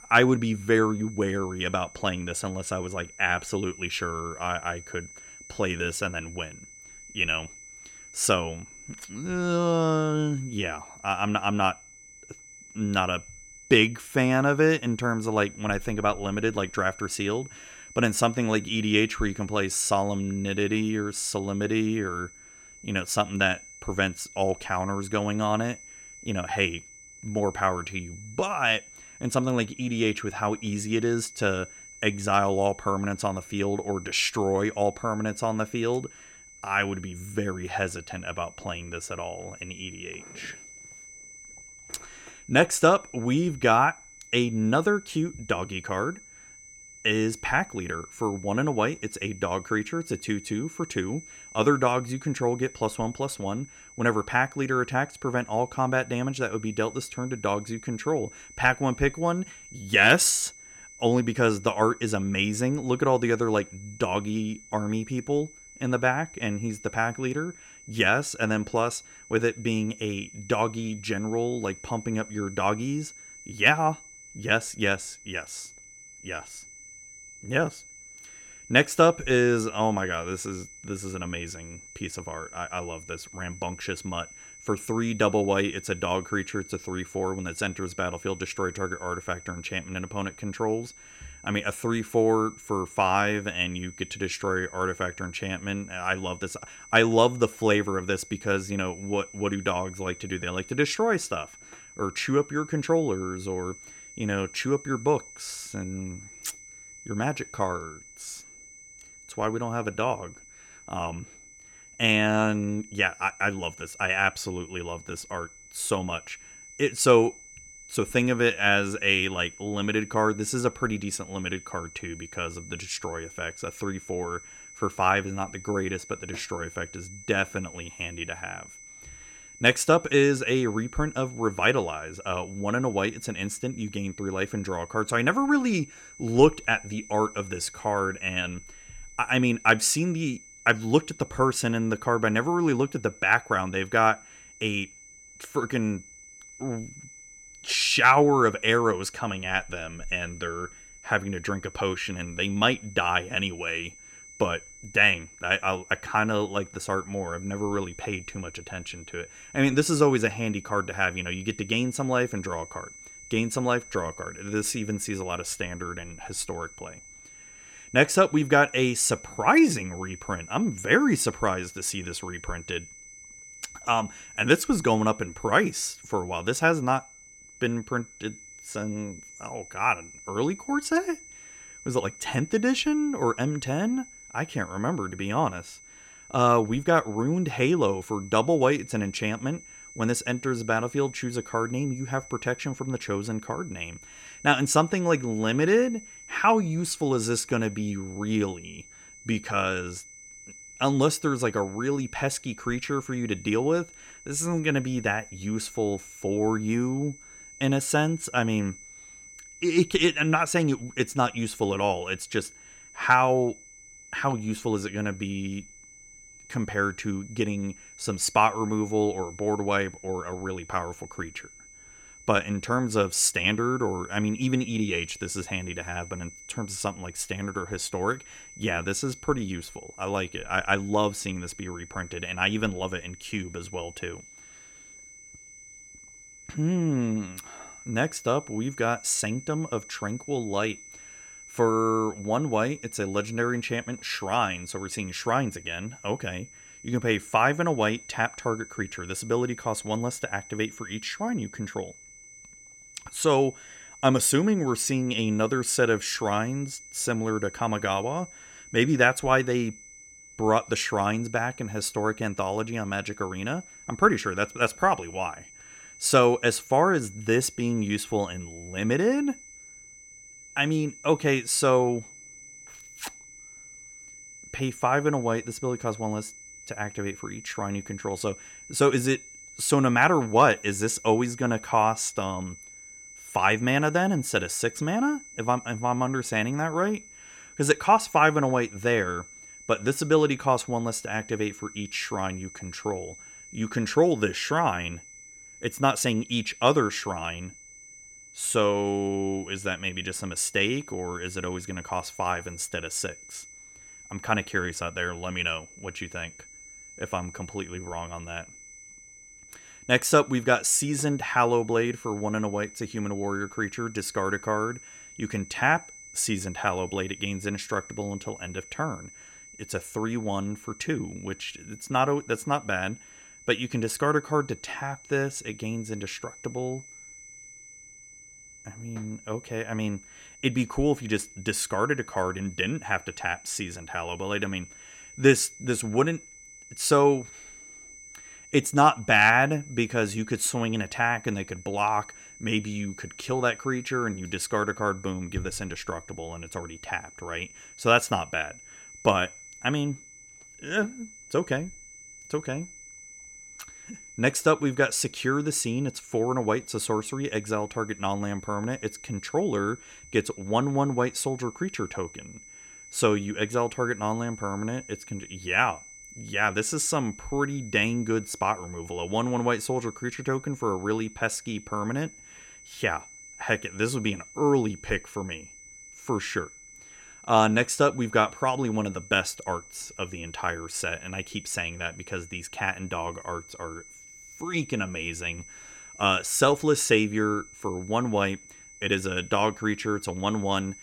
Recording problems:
high-pitched whine; noticeable; throughout; 6 kHz, 20 dB below the speech

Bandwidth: 16.5 kHz